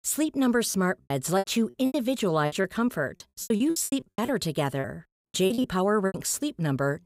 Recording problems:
choppy; very; 16% of the speech affected

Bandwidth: 15.5 kHz